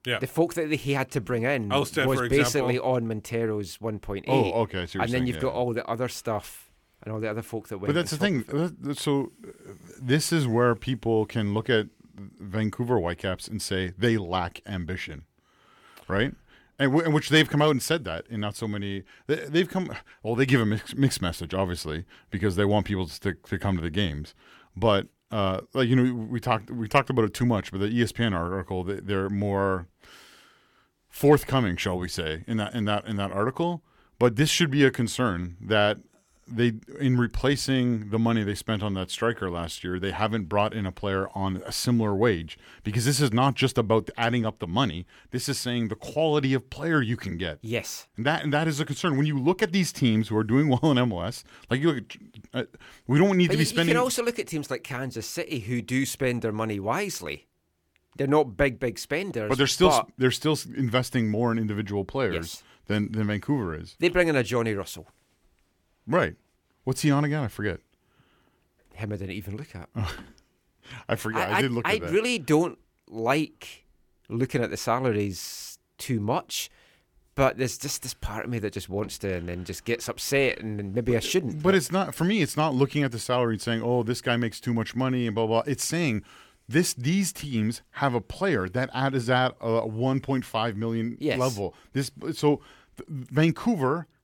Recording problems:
none

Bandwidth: 17.5 kHz